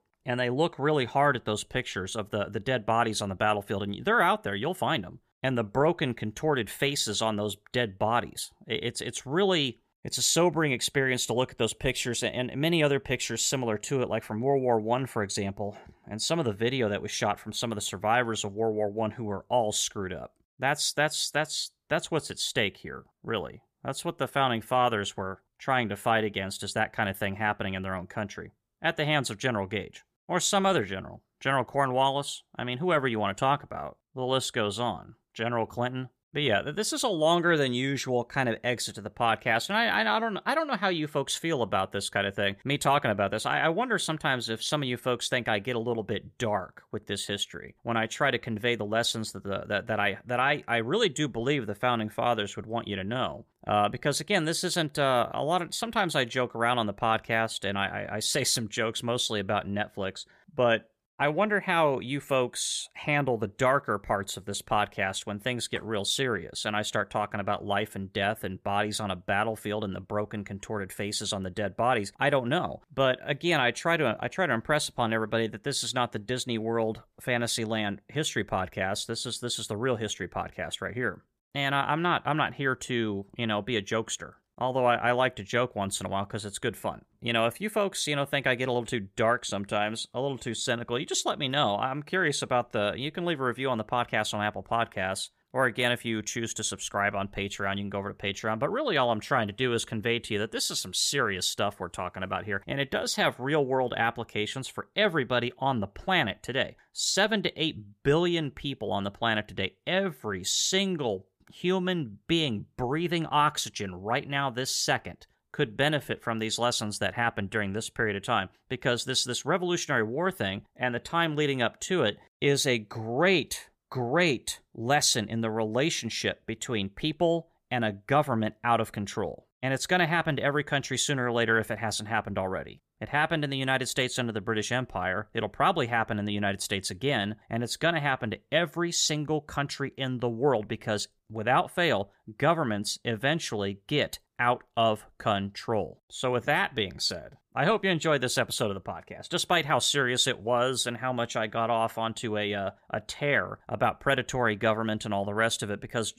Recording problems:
none

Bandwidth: 15 kHz